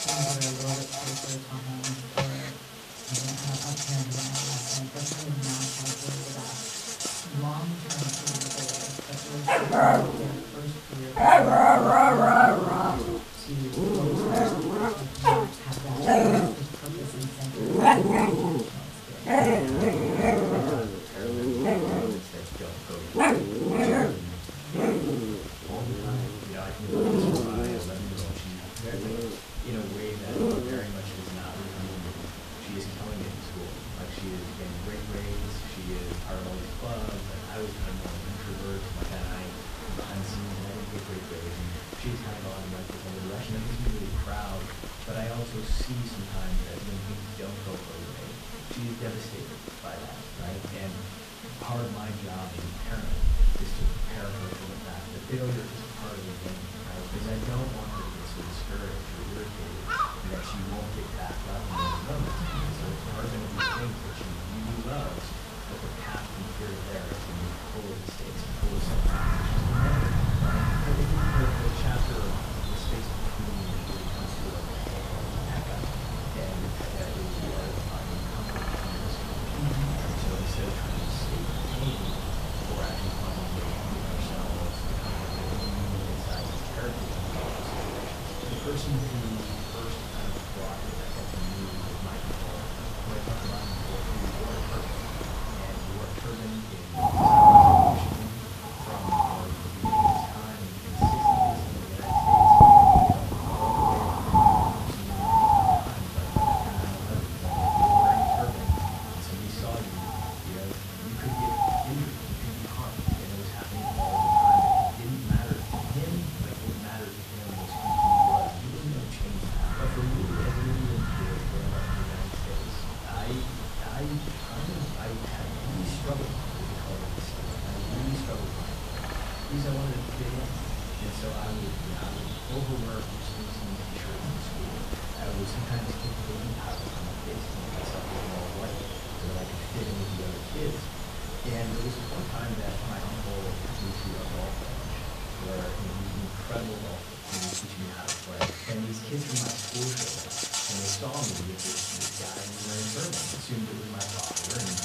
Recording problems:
off-mic speech; far
room echo; slight; dies away in 0.6 s
animal sounds; very loud; throughout; 10 dB above the speech
electrical hum; loud; throughout; 60 Hz, 5 dB below the speech
hiss; loud; throughout; 6 dB below the speech

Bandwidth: 14.5 kHz